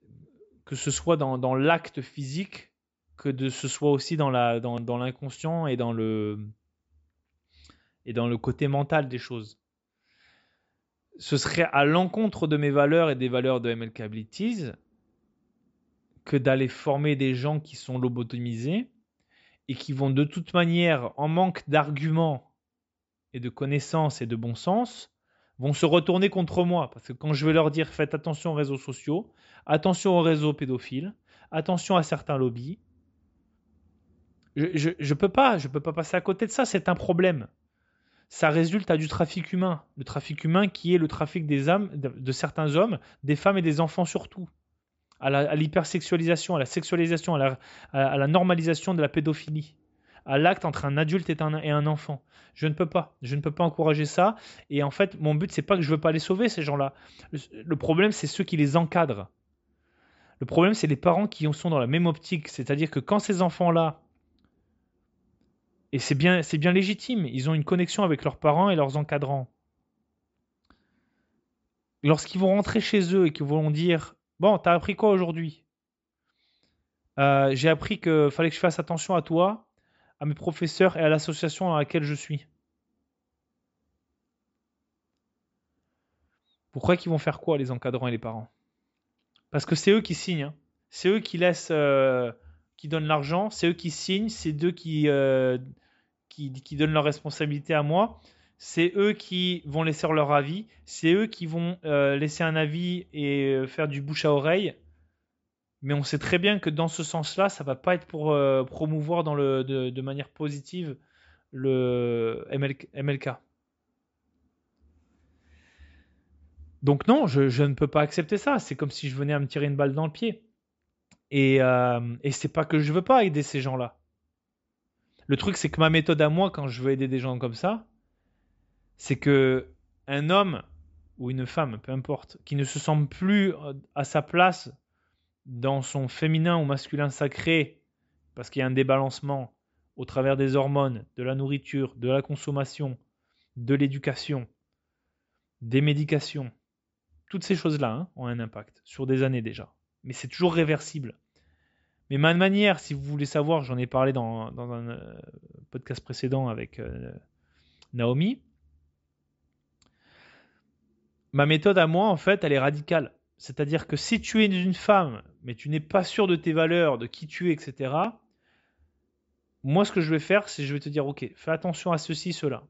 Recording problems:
high frequencies cut off; noticeable; nothing above 8 kHz

